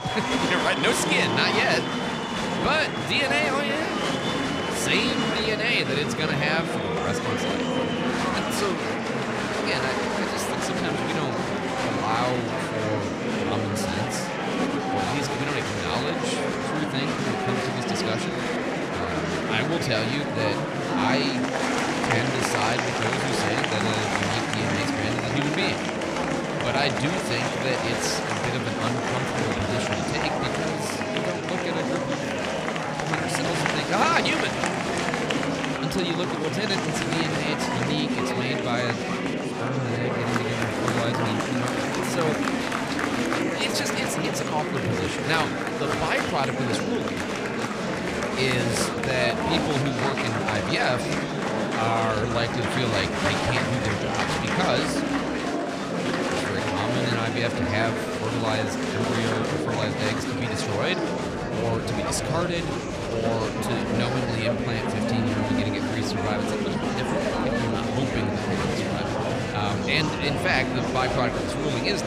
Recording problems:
murmuring crowd; very loud; throughout; 2 dB above the speech

